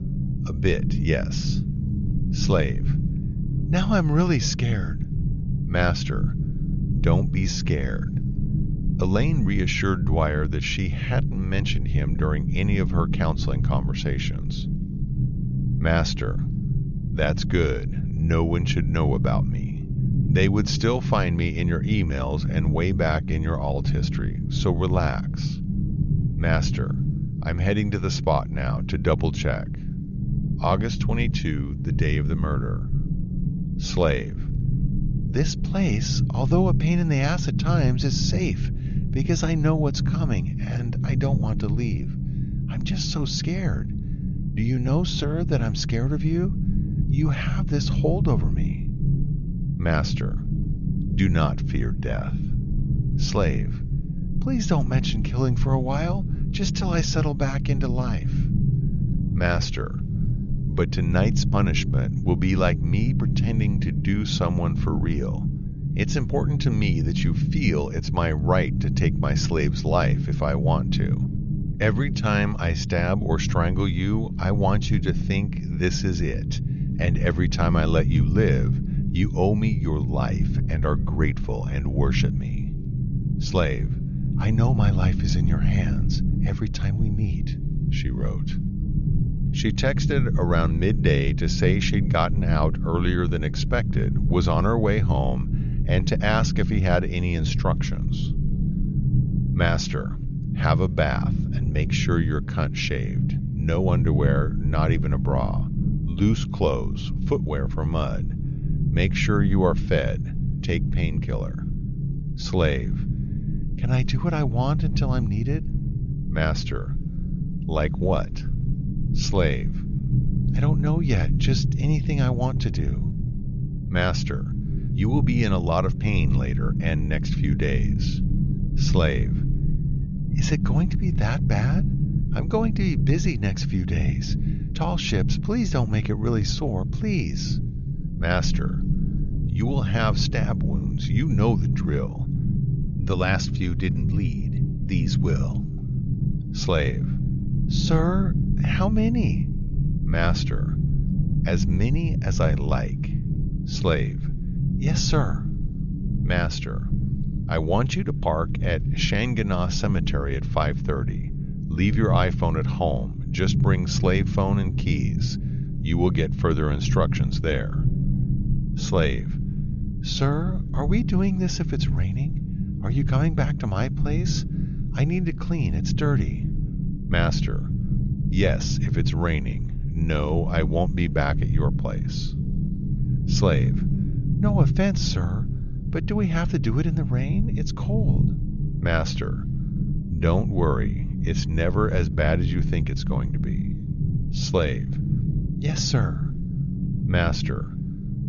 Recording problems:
high frequencies cut off; noticeable; nothing above 7 kHz
low rumble; loud; throughout; 8 dB below the speech

